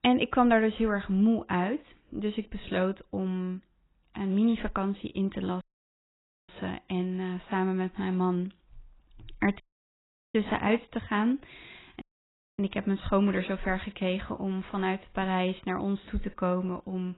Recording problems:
garbled, watery; badly; nothing above 4 kHz
audio cutting out; at 5.5 s for 1 s, at 9.5 s for 0.5 s and at 12 s for 0.5 s

